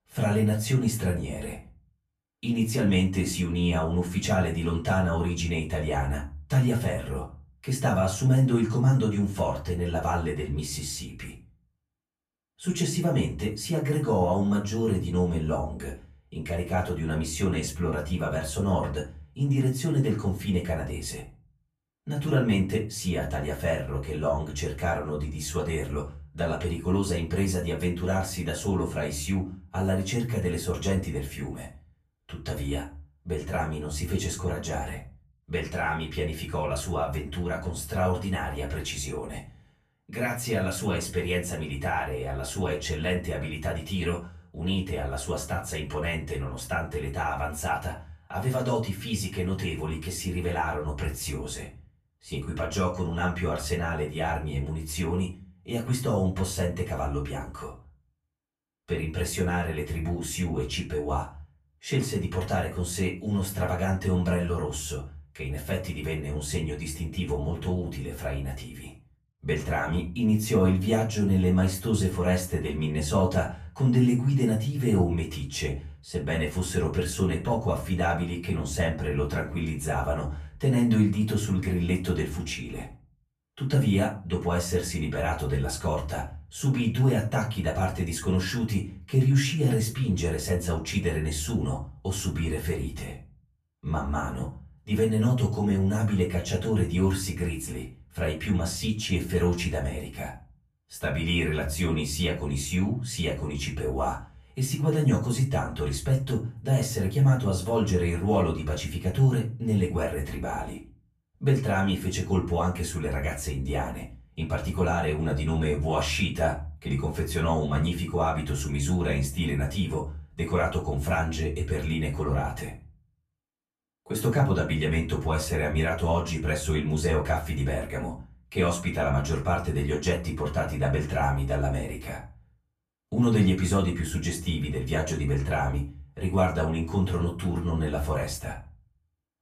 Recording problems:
off-mic speech; far
room echo; slight; dies away in 0.4 s

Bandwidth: 14.5 kHz